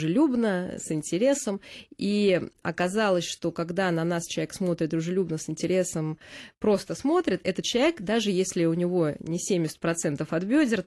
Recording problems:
garbled, watery; slightly; nothing above 11.5 kHz
abrupt cut into speech; at the start

